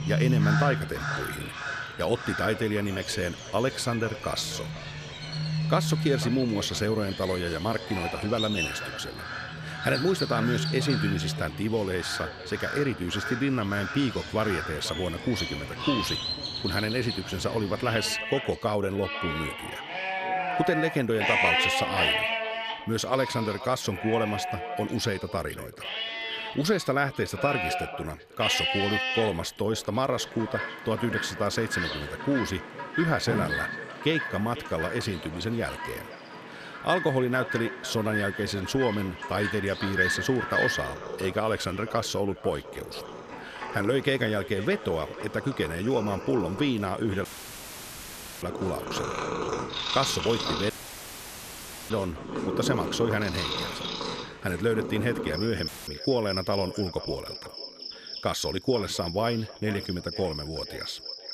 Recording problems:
echo of what is said; noticeable; throughout; 500 ms later, 15 dB below the speech
animal sounds; loud; throughout; 3 dB below the speech
audio cutting out; filled with static; at 47 s for 1 s, at 51 s for 1 s and at 56 s

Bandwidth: 14 kHz